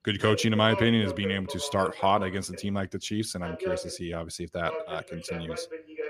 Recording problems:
voice in the background; loud; throughout; 9 dB below the speech

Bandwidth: 15 kHz